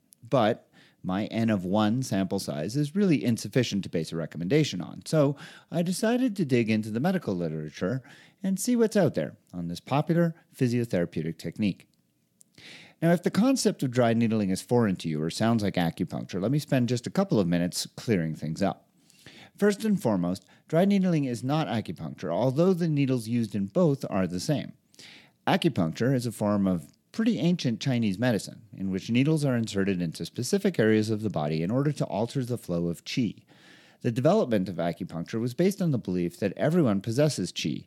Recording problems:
uneven, jittery; strongly; from 5.5 to 36 s

